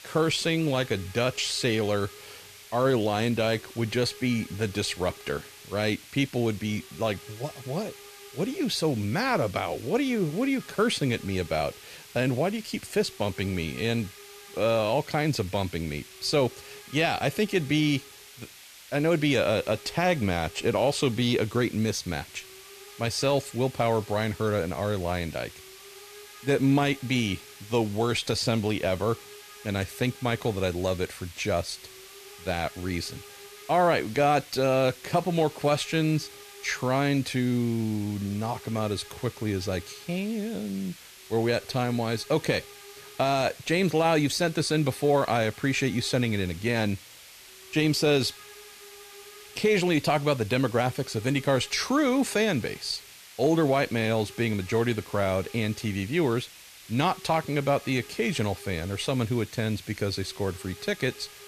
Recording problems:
hiss; noticeable; throughout; 20 dB below the speech

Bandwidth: 14.5 kHz